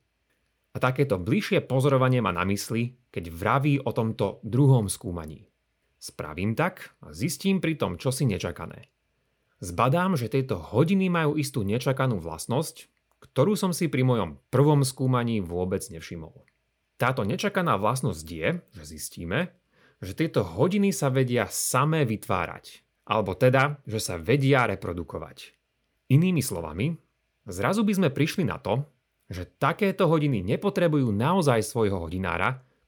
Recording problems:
none

